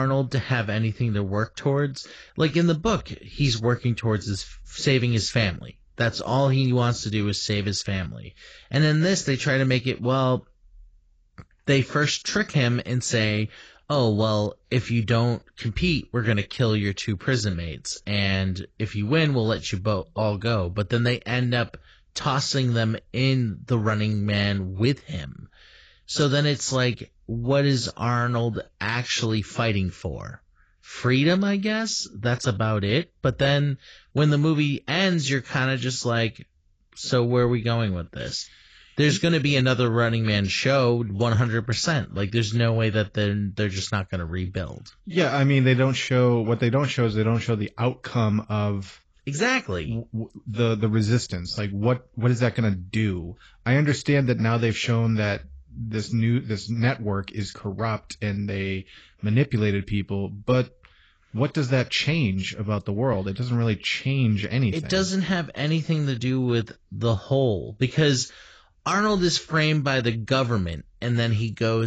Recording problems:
garbled, watery; badly; nothing above 7.5 kHz
abrupt cut into speech; at the start and the end

